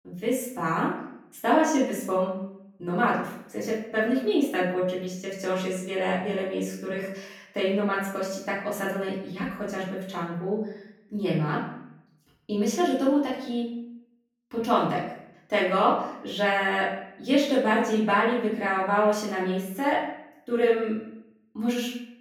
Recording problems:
off-mic speech; far
room echo; noticeable; dies away in 0.7 s

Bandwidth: 18 kHz